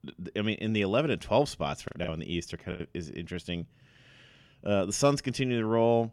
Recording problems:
choppy; very; at 2 s; 9% of the speech affected

